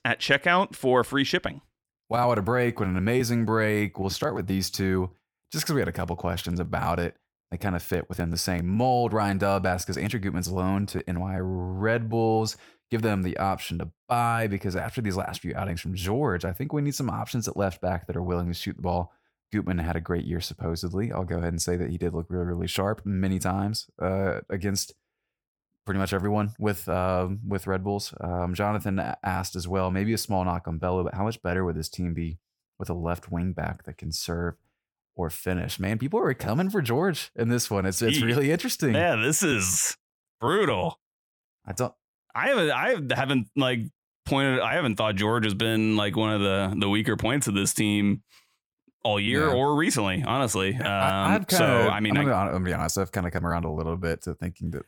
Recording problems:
none

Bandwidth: 18 kHz